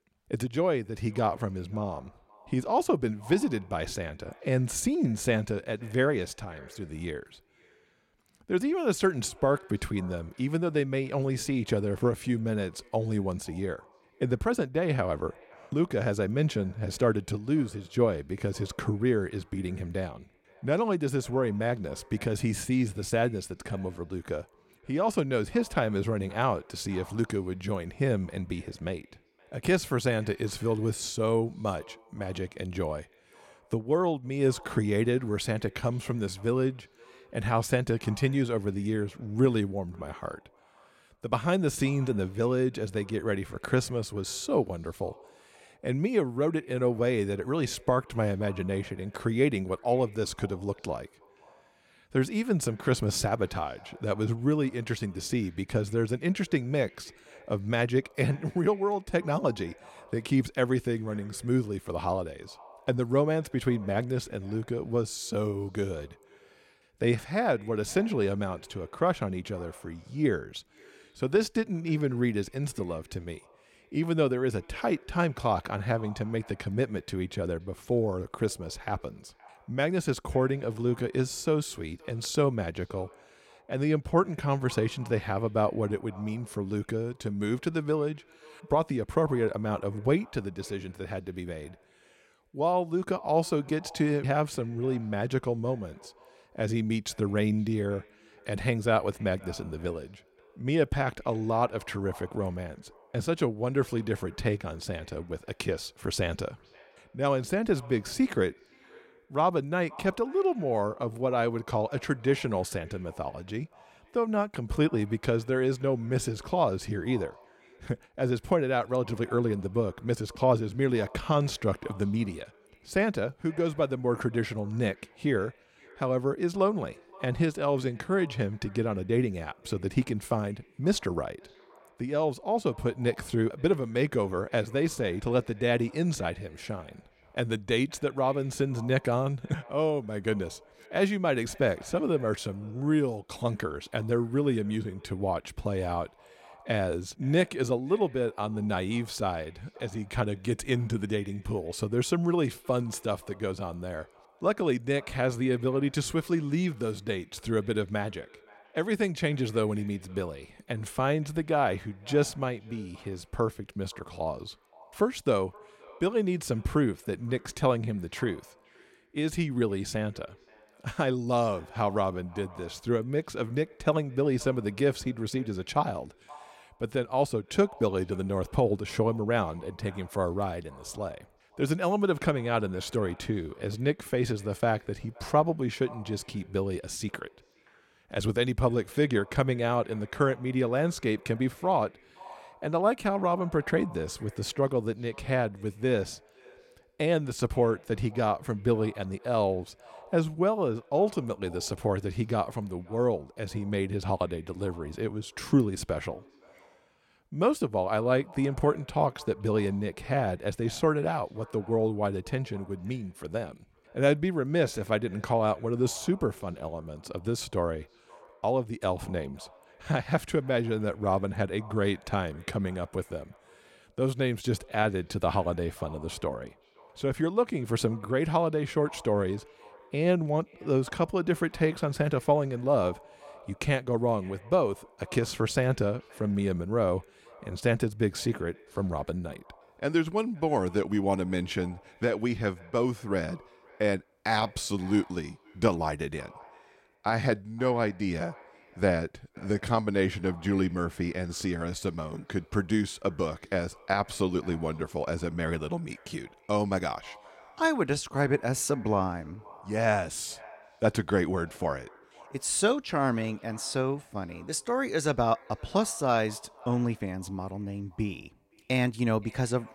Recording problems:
echo of what is said; faint; throughout; 520 ms later, 25 dB below the speech

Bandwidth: 16 kHz